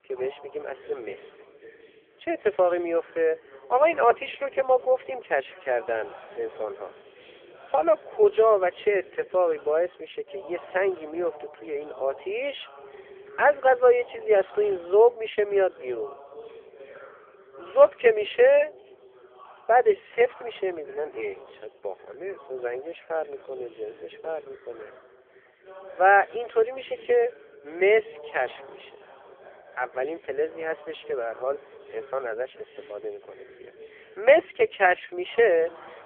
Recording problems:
phone-call audio; poor line; nothing above 3.5 kHz
background chatter; faint; throughout; 3 voices, 25 dB below the speech

